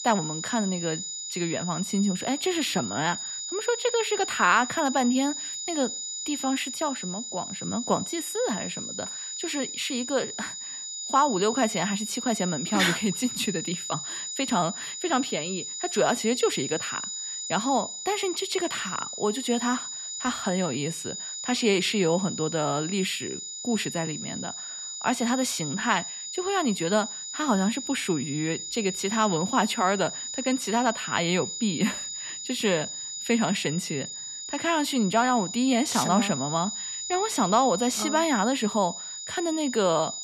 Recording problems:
high-pitched whine; loud; throughout; 7 kHz, 6 dB below the speech

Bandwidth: 13.5 kHz